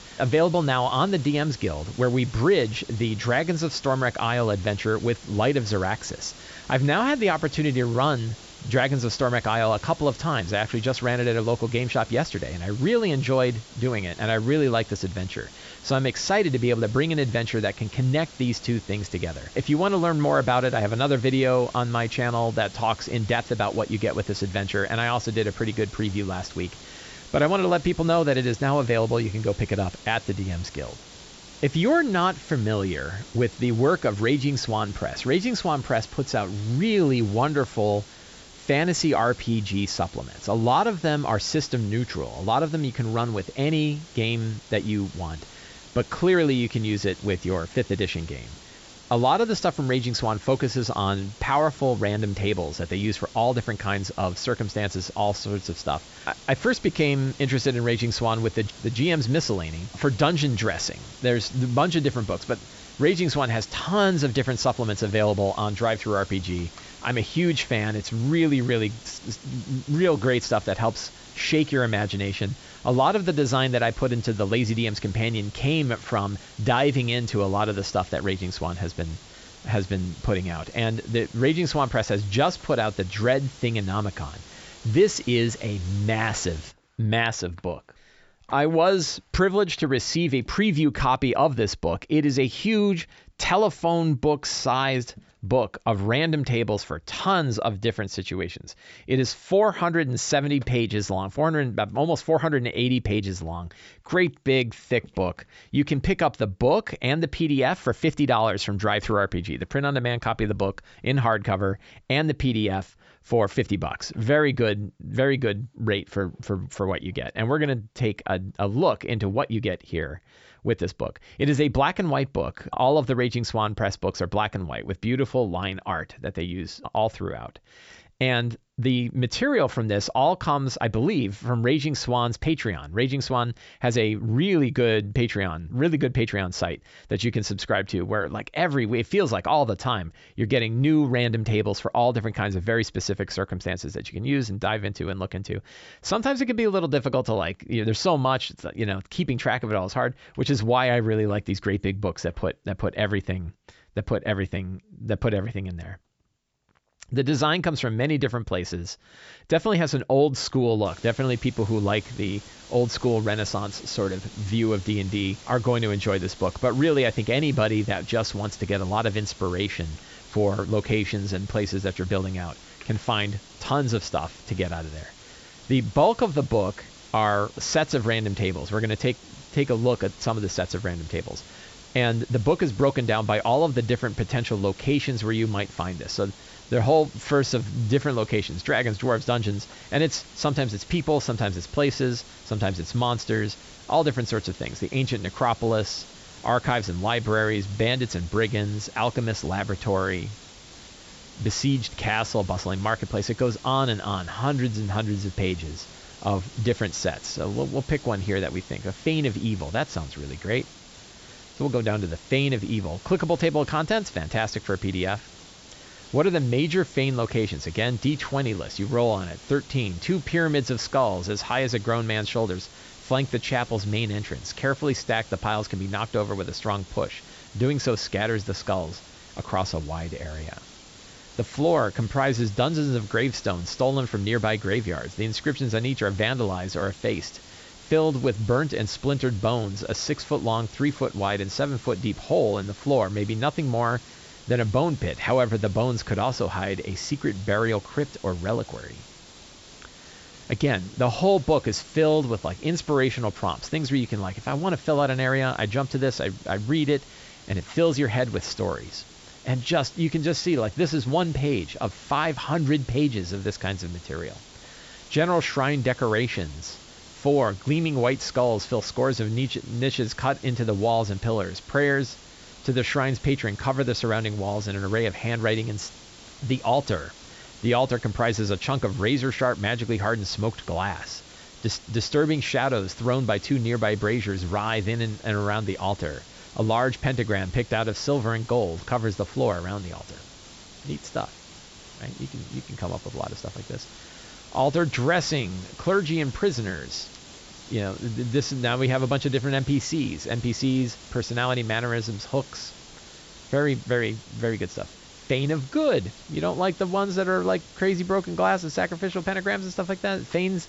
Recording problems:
high frequencies cut off; noticeable; nothing above 8 kHz
hiss; noticeable; until 1:27 and from 2:41 on; 20 dB below the speech

